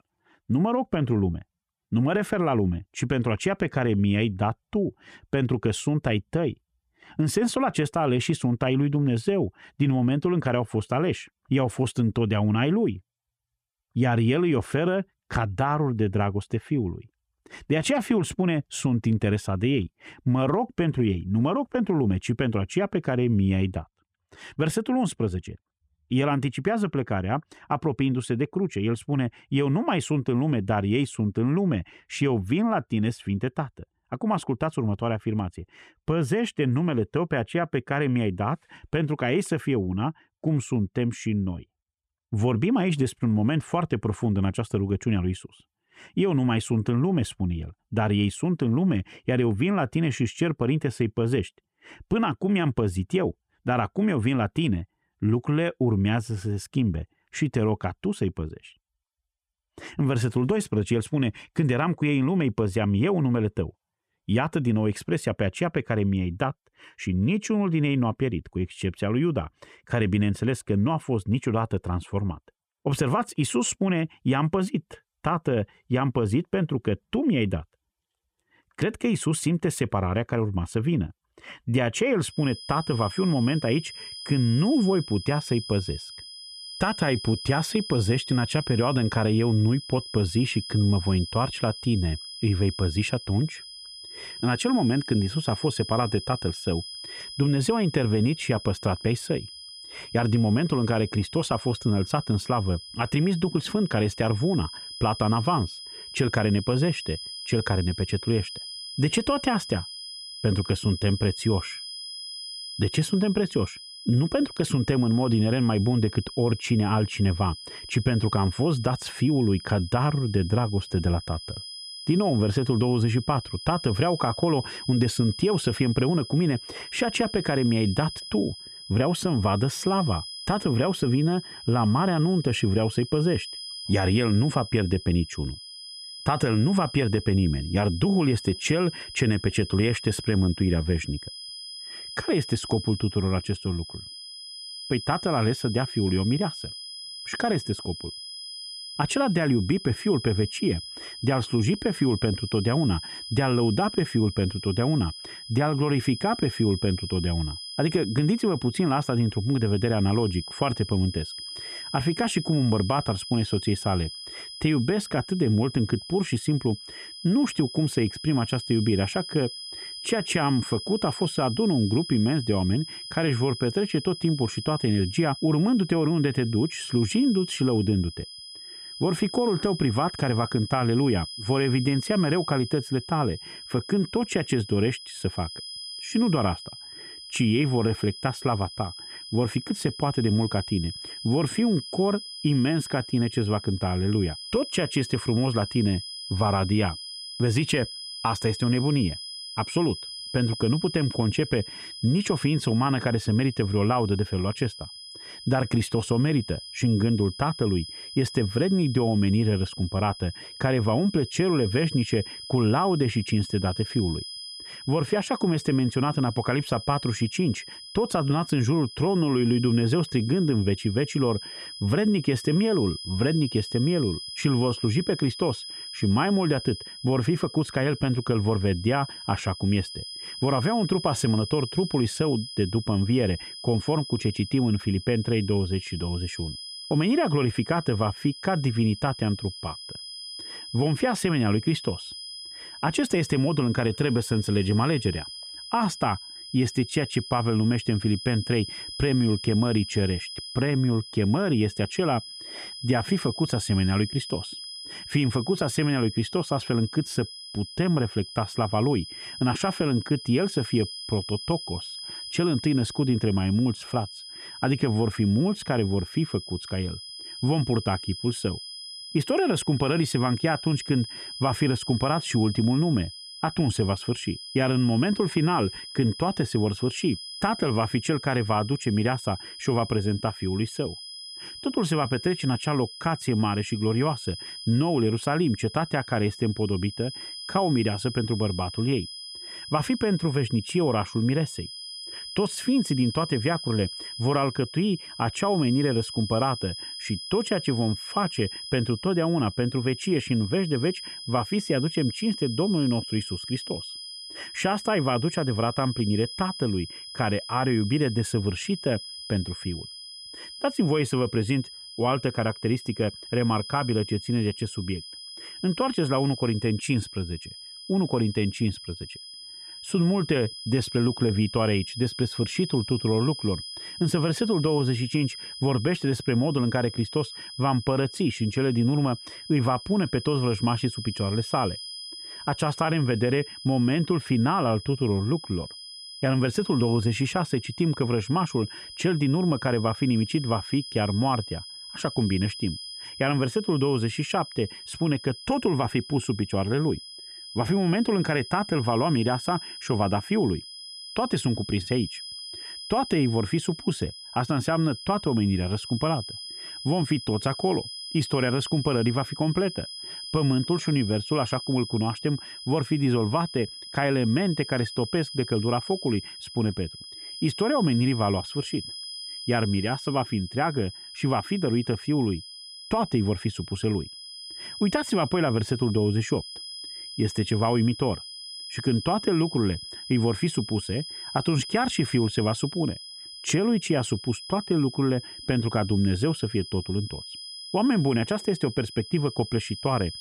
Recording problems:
high-pitched whine; noticeable; from 1:22 on; 5 kHz, 10 dB below the speech

